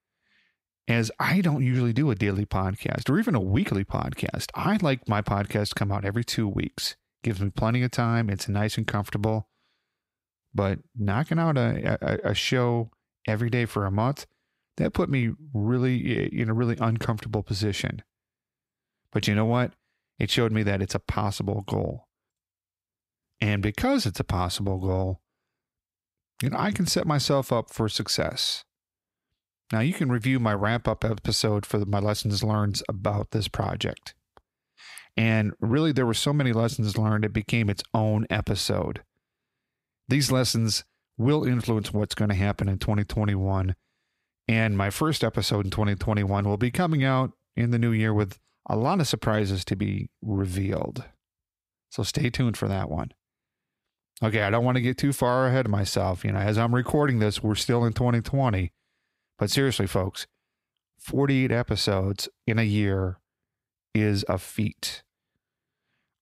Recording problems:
none

